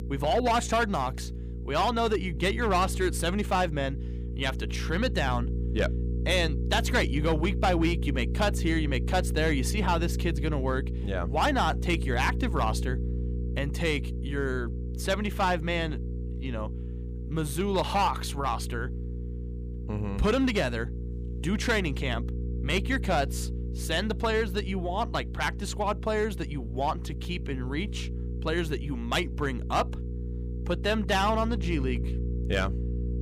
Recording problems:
distortion; slight; 4% of the sound clipped
electrical hum; noticeable; throughout; 60 Hz, 15 dB below the speech

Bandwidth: 15 kHz